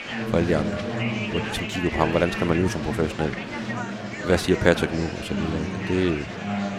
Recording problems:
murmuring crowd; loud; throughout; 4 dB below the speech

